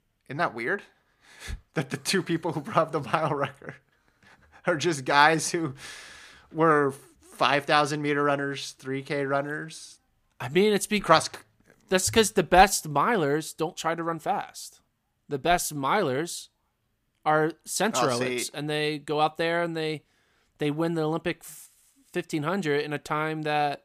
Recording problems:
none

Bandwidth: 15 kHz